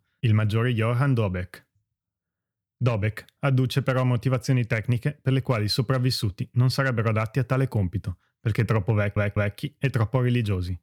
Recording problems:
audio stuttering; at 9 s

